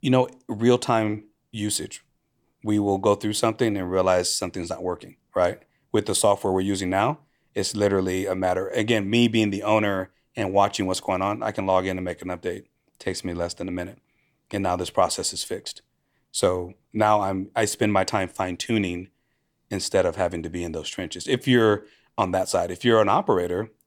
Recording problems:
none

